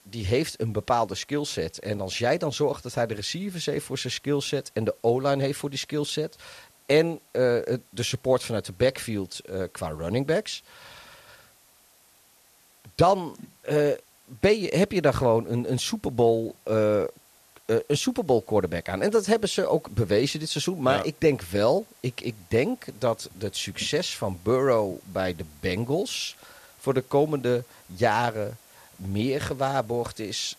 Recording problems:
hiss; faint; throughout; 30 dB below the speech

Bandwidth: 14 kHz